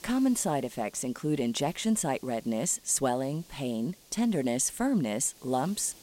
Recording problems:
hiss; faint; throughout; 25 dB below the speech

